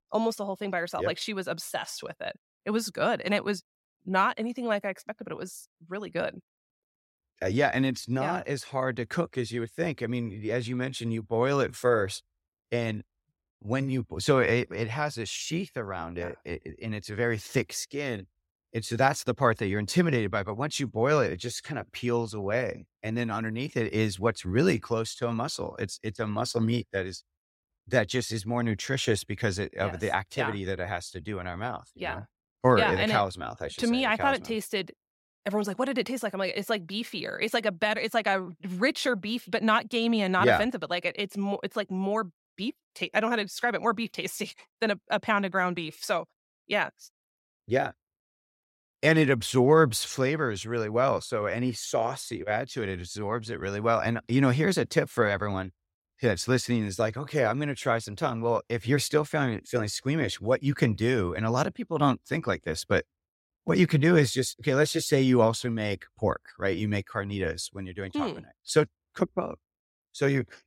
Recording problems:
none

